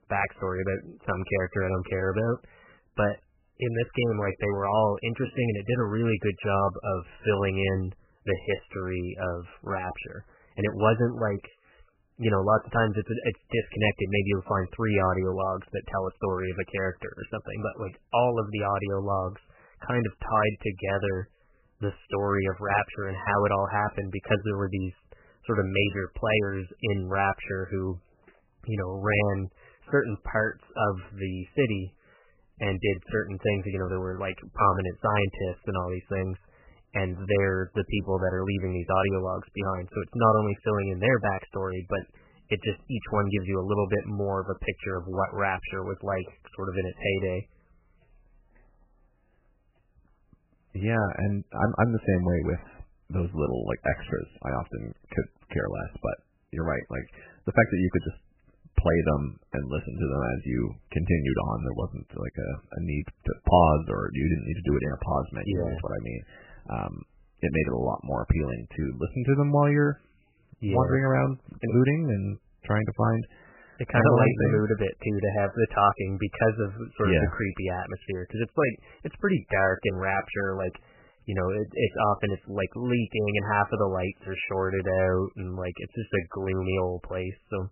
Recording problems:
garbled, watery; badly; nothing above 3 kHz

